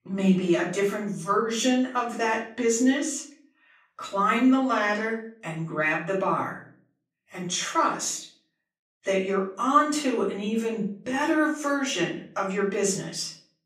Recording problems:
off-mic speech; far
room echo; slight; dies away in 0.4 s

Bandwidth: 14 kHz